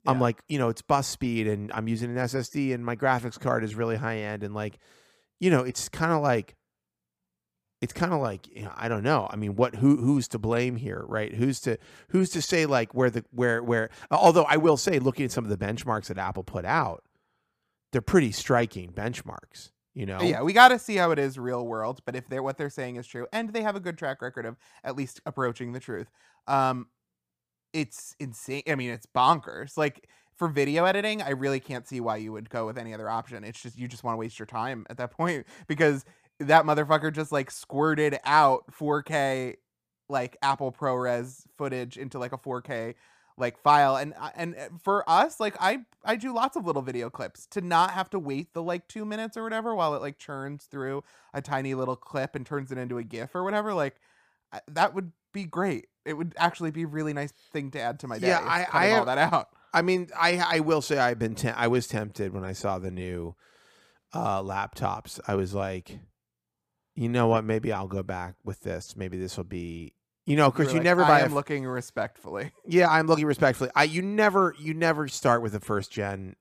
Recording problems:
none

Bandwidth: 15 kHz